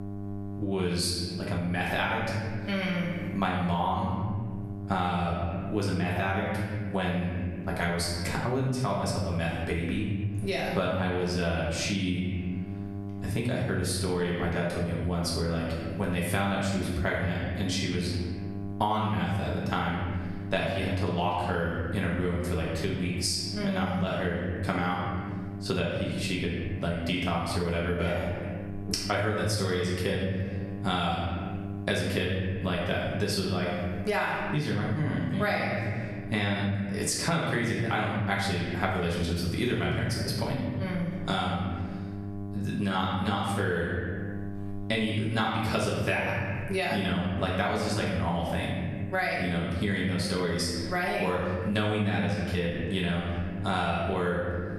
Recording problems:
off-mic speech; far
room echo; noticeable; dies away in 1 s
squashed, flat; somewhat
electrical hum; noticeable; throughout; 50 Hz, 20 dB below the speech

